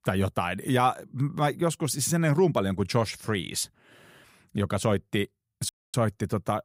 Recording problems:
audio cutting out; at 5.5 s

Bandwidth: 15.5 kHz